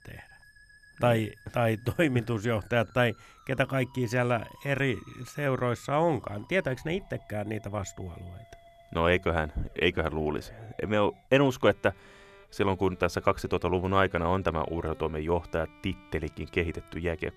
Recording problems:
background music; faint; throughout; 25 dB below the speech

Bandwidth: 14 kHz